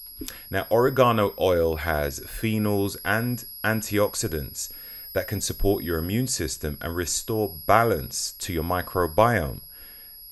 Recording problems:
high-pitched whine; noticeable; throughout; 11.5 kHz, 15 dB below the speech

